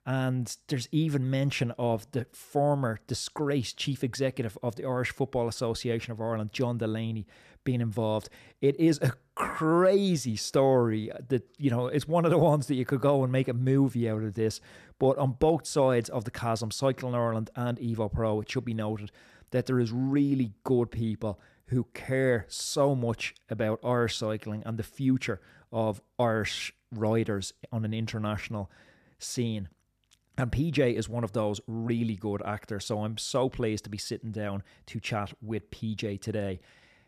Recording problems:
none

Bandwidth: 14.5 kHz